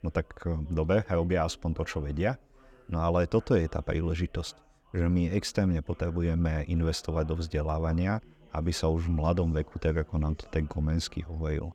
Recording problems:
background chatter; faint; throughout; 3 voices, 25 dB below the speech

